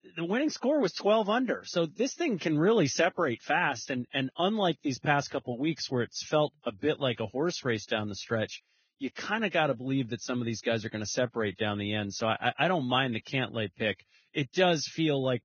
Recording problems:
garbled, watery; badly; nothing above 6.5 kHz

